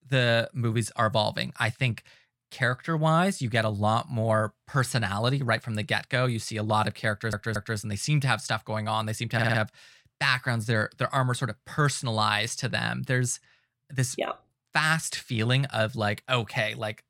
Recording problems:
audio stuttering; at 7 s and at 9.5 s

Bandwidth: 16.5 kHz